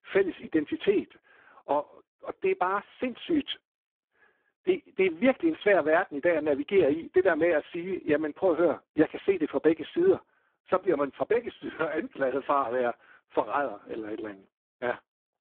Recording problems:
phone-call audio; poor line

